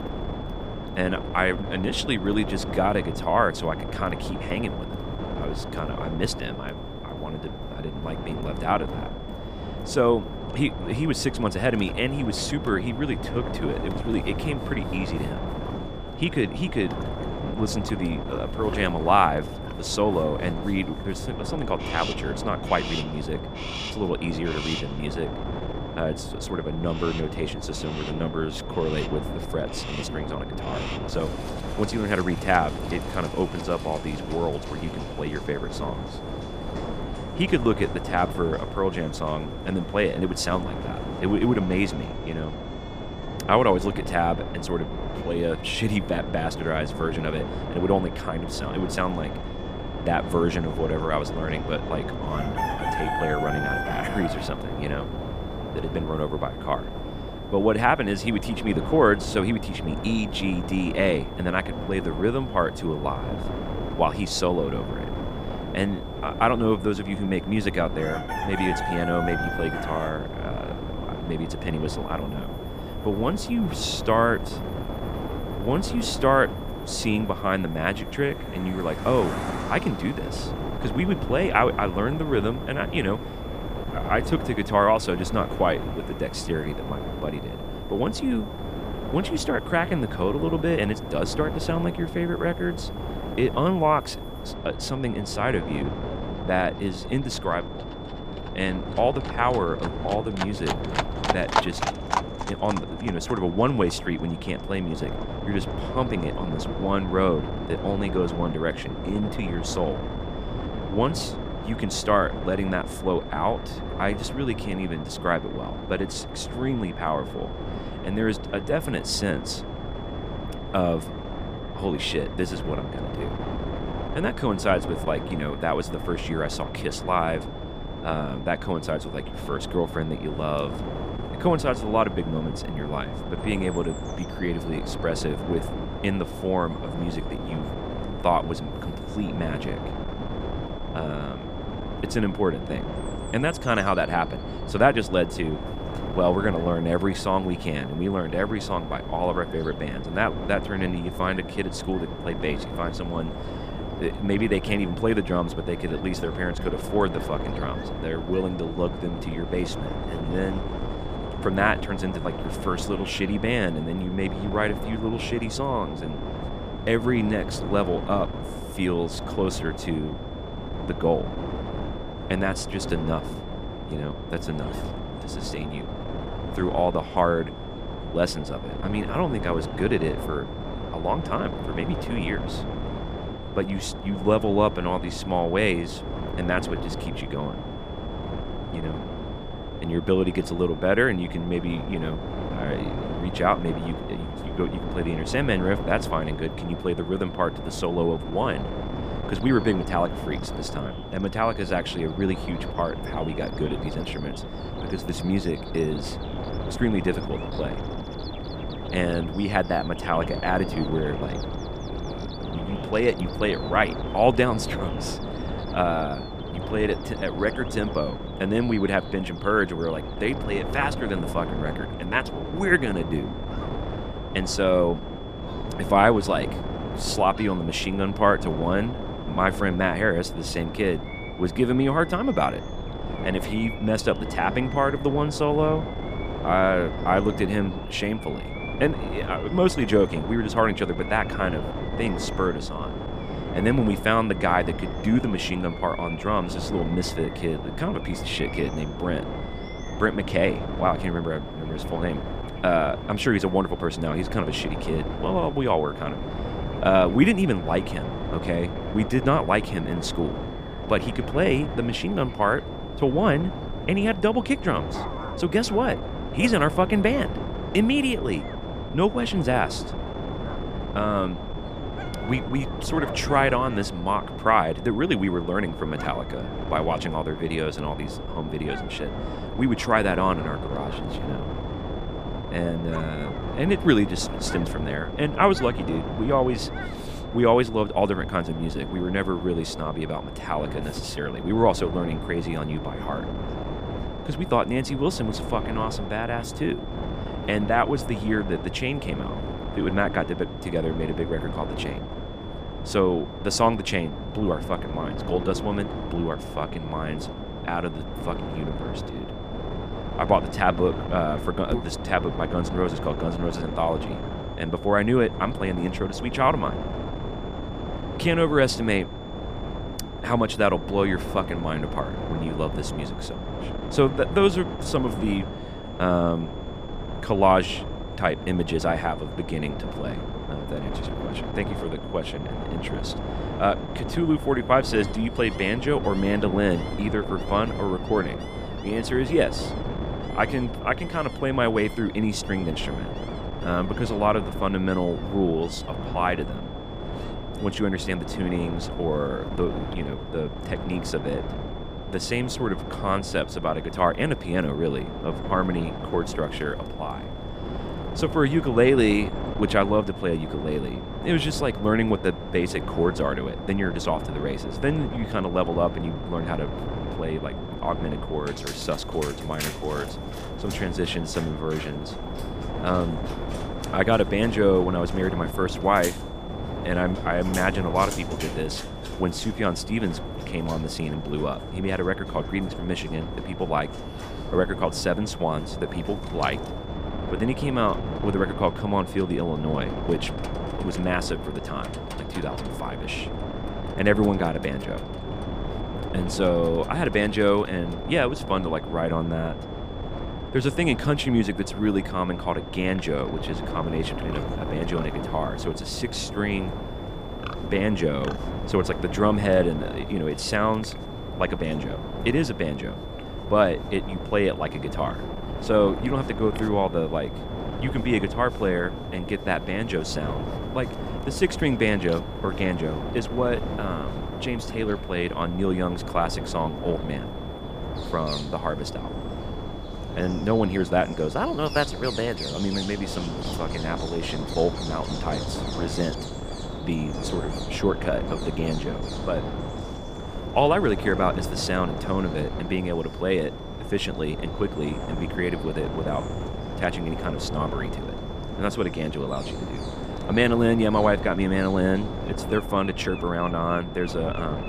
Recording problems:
wind noise on the microphone; heavy; 10 dB below the speech
animal sounds; noticeable; throughout; 15 dB below the speech
high-pitched whine; faint; throughout; 3.5 kHz, 20 dB below the speech

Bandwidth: 15 kHz